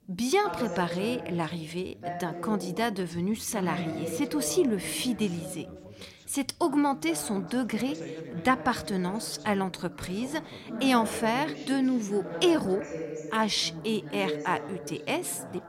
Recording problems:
background chatter; loud; throughout; 2 voices, 9 dB below the speech

